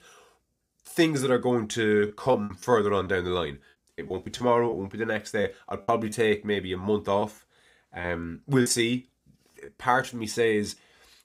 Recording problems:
choppy; very; 7% of the speech affected

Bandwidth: 15.5 kHz